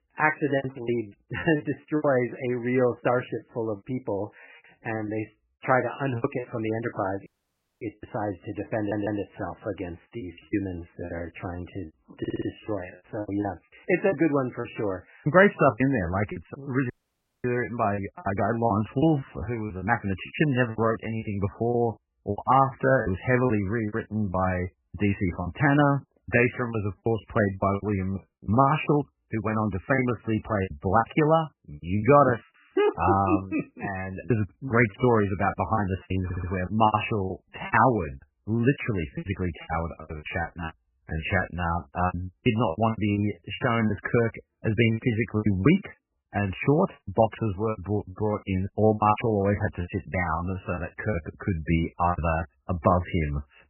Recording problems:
garbled, watery; badly; nothing above 3 kHz
choppy; very; 12% of the speech affected
audio cutting out; at 7.5 s for 0.5 s and at 17 s for 0.5 s
audio stuttering; at 9 s, at 12 s and at 36 s

